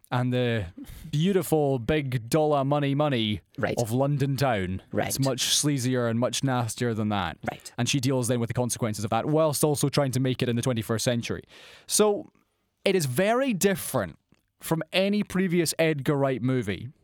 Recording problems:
uneven, jittery; strongly; from 1 to 16 s

